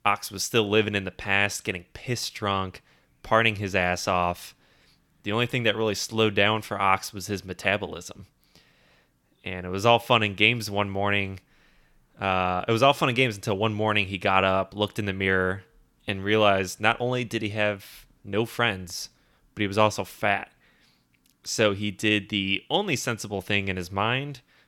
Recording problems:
none

